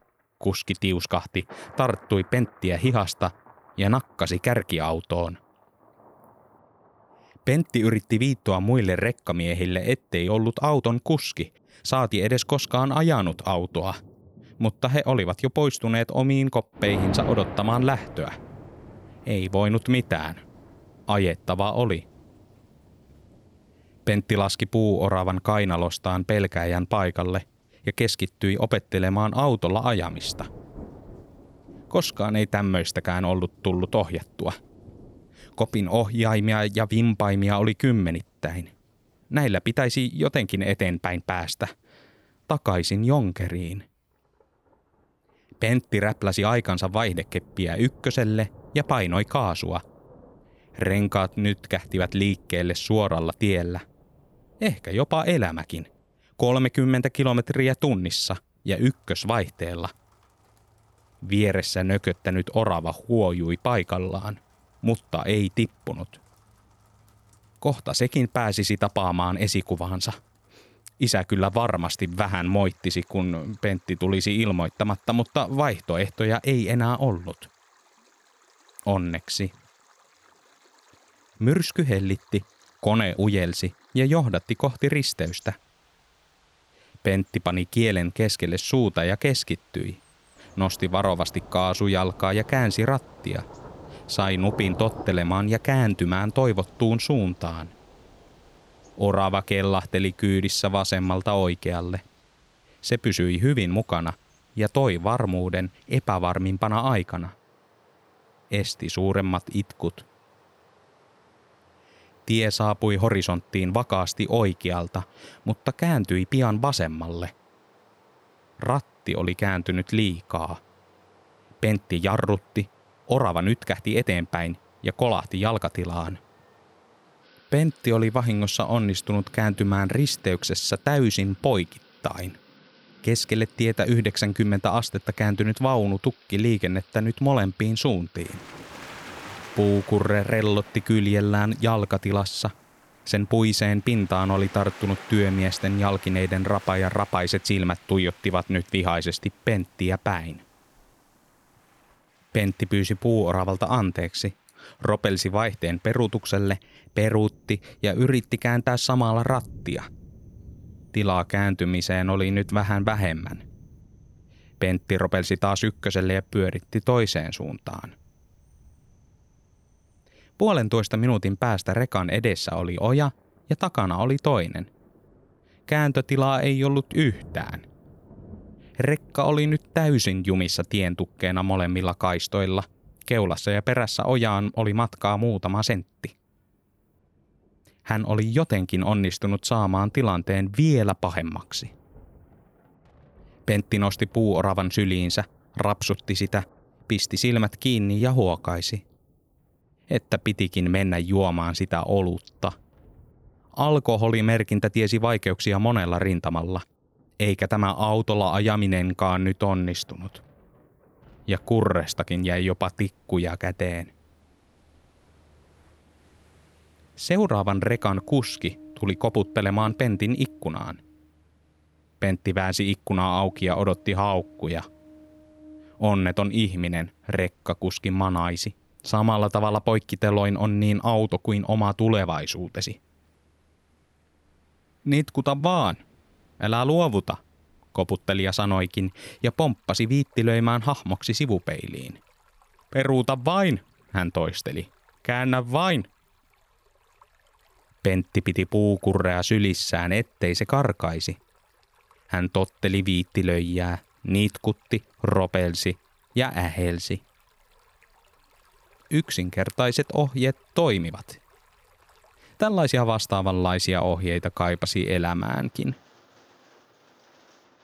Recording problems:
rain or running water; faint; throughout; 25 dB below the speech

